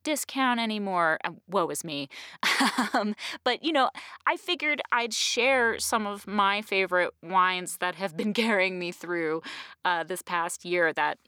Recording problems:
none

